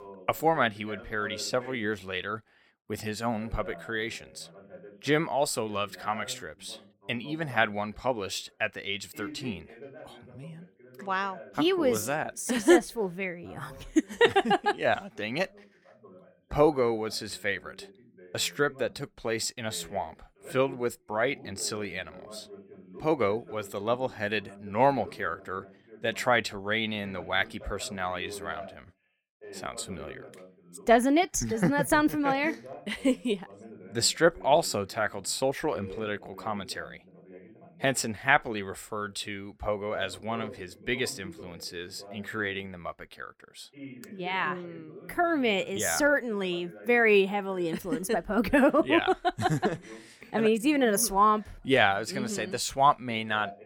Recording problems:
voice in the background; faint; throughout; 20 dB below the speech

